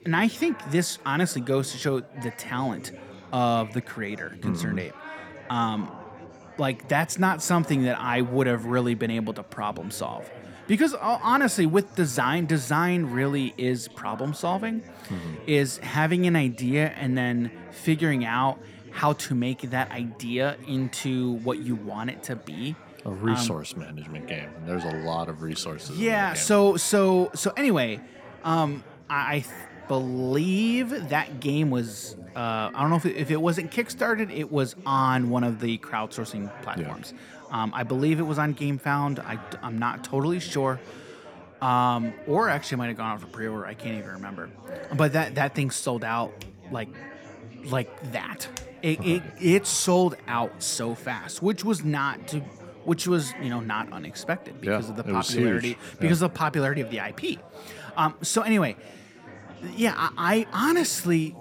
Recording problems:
chatter from many people; noticeable; throughout; 20 dB below the speech

